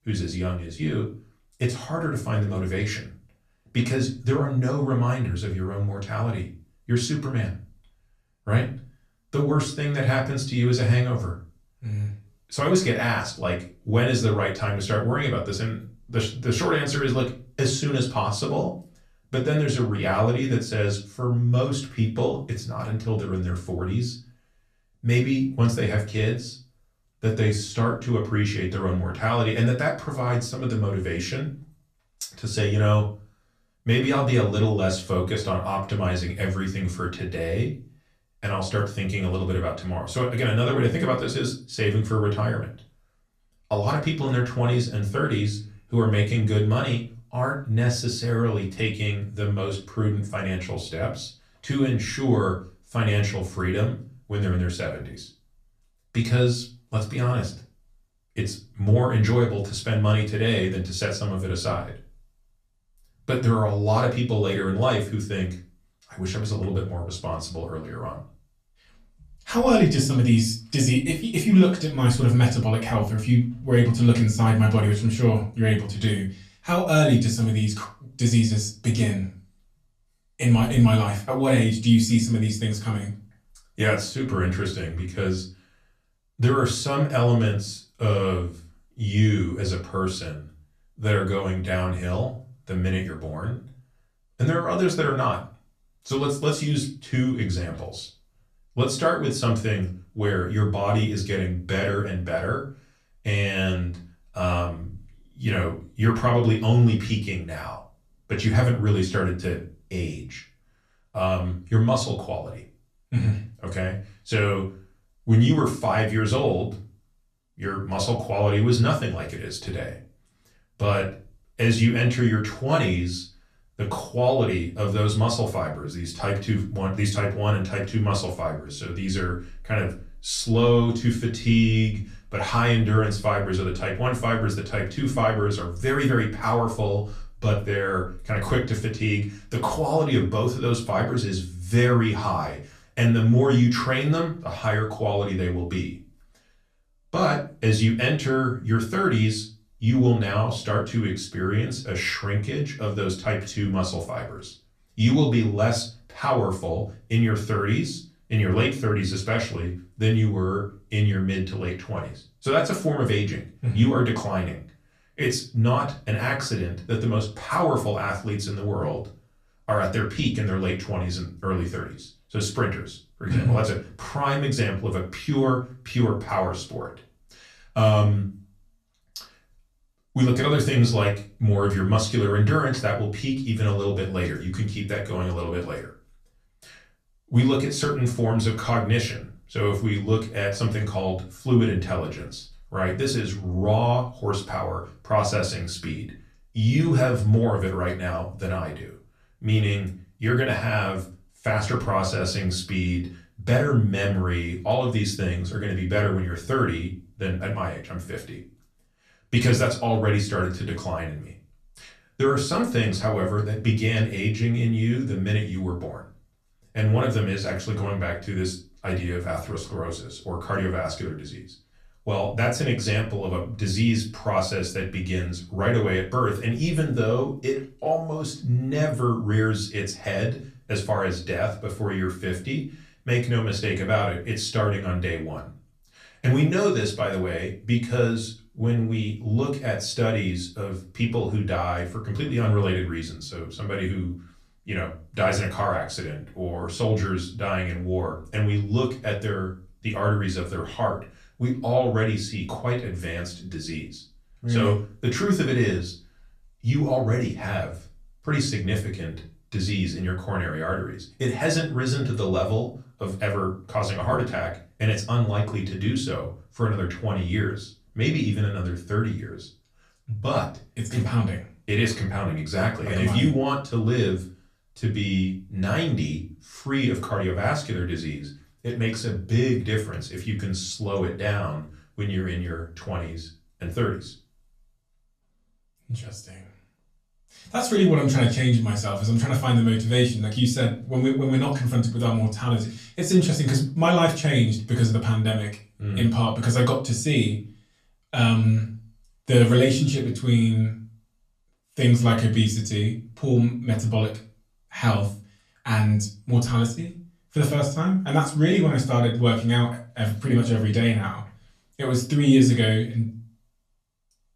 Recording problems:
off-mic speech; far
room echo; very slight; dies away in 0.3 s

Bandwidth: 14.5 kHz